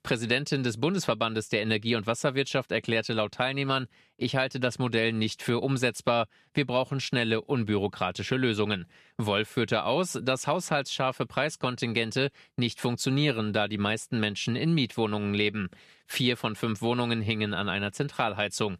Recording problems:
none

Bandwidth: 14.5 kHz